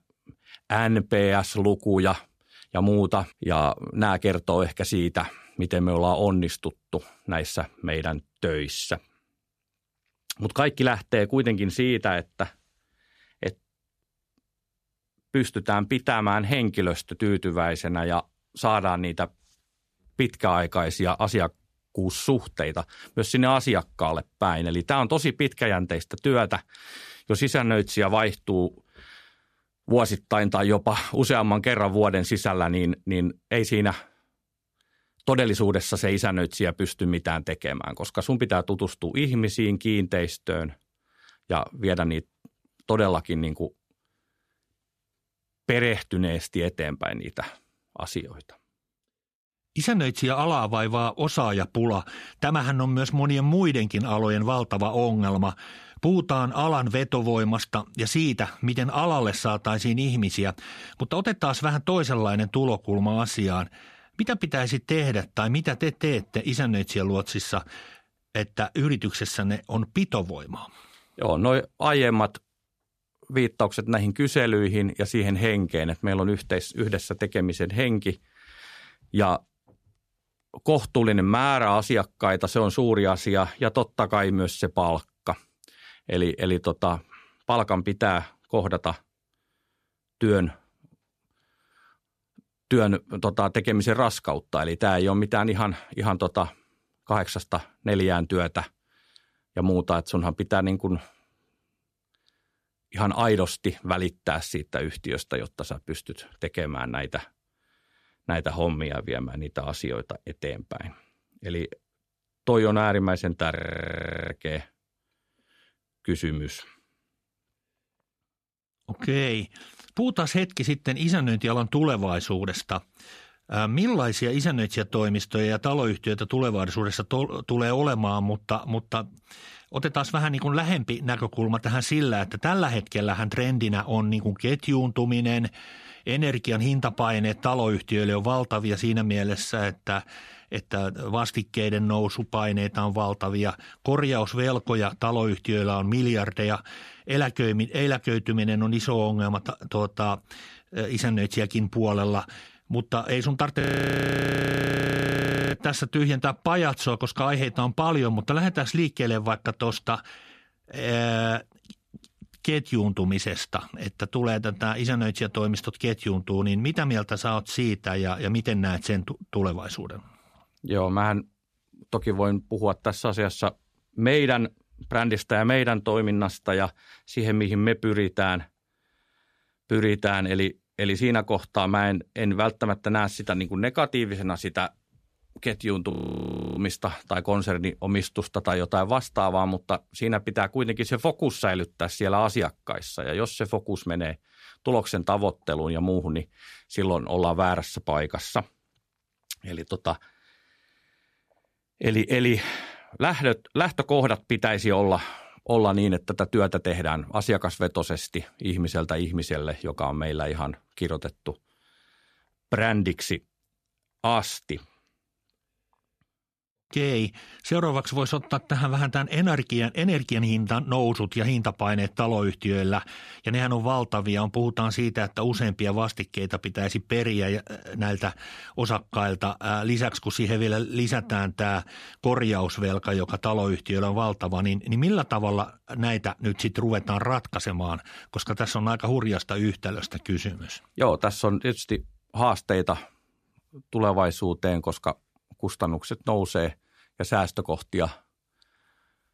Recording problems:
audio freezing; at 1:54 for 0.5 s, at 2:34 for 2 s and at 3:06 for 0.5 s

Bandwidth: 14.5 kHz